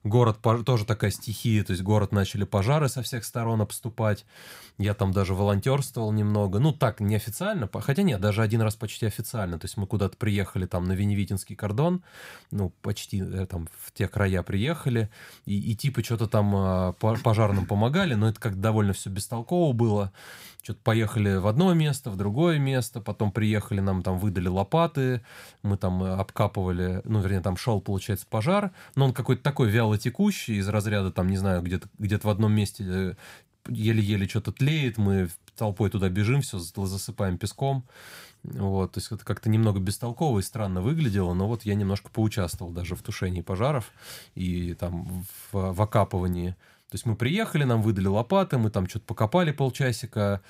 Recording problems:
none

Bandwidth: 15.5 kHz